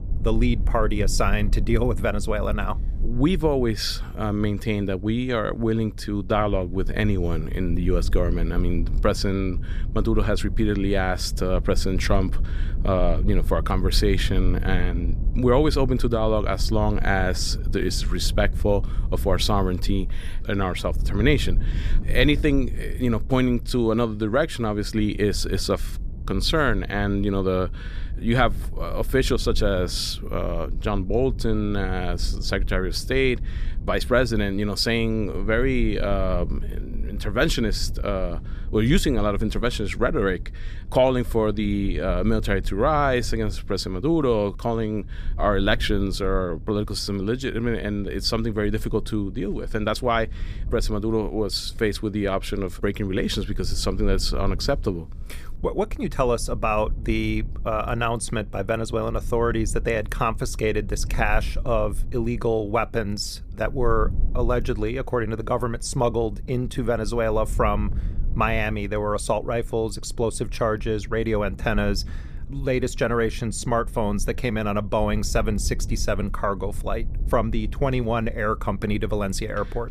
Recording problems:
low rumble; faint; throughout; 20 dB below the speech

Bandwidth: 14.5 kHz